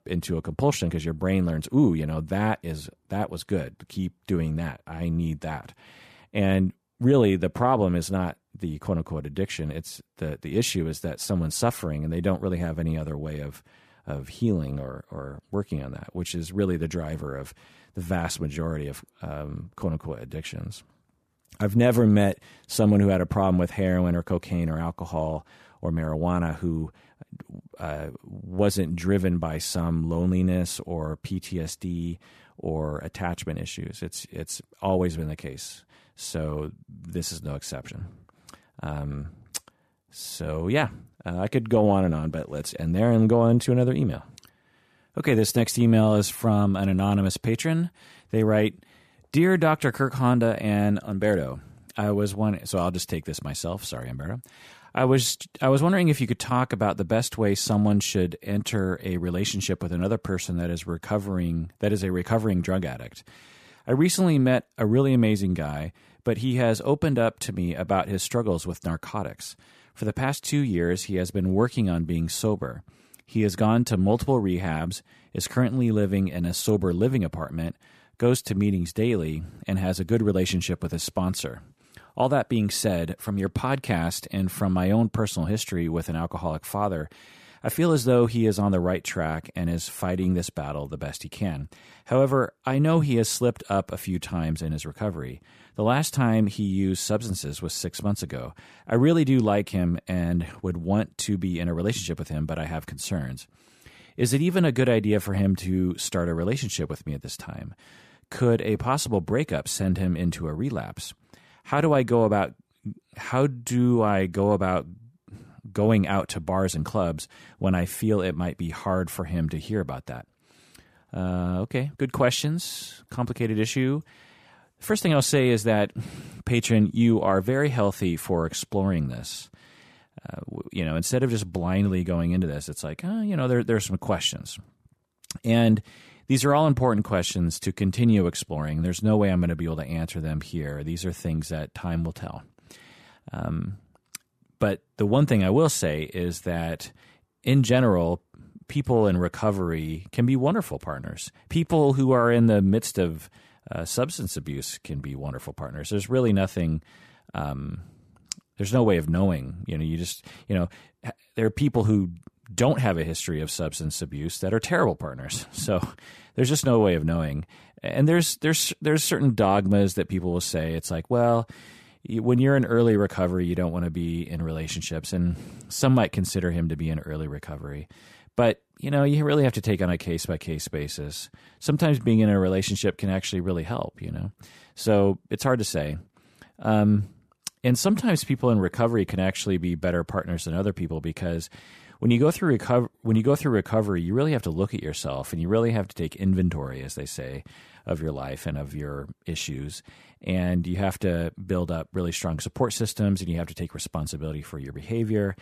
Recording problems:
none

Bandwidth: 14.5 kHz